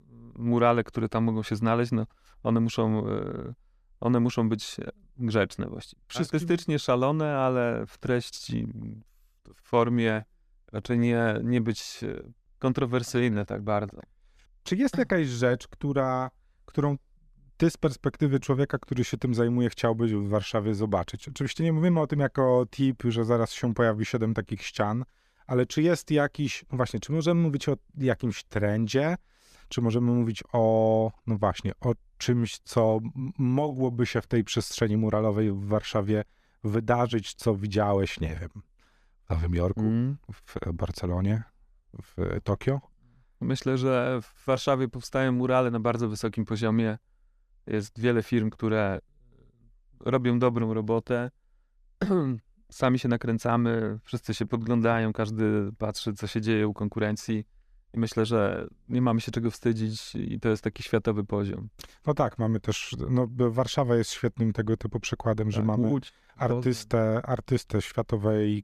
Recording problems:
none

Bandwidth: 14.5 kHz